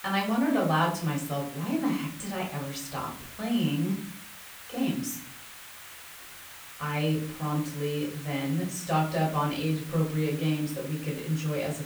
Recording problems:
off-mic speech; far
room echo; slight; dies away in 0.5 s
hiss; noticeable; throughout; 15 dB below the speech

